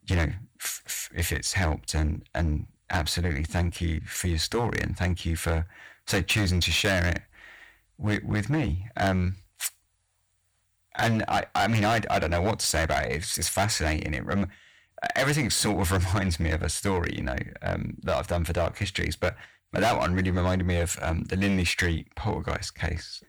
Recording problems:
distortion; heavy; 9% of the sound clipped

